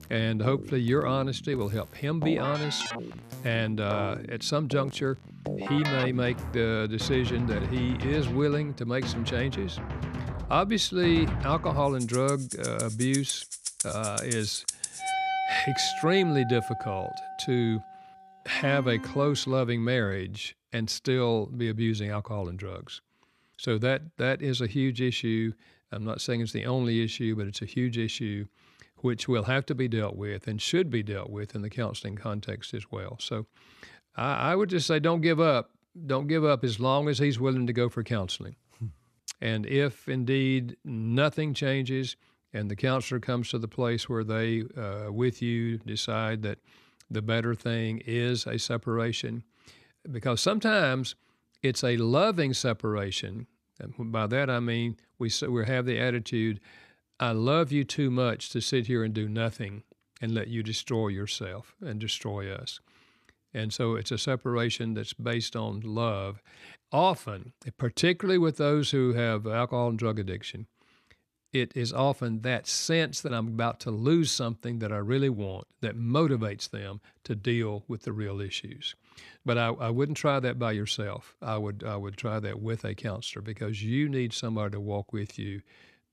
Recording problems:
background music; loud; until 19 s; 6 dB below the speech

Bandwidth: 14.5 kHz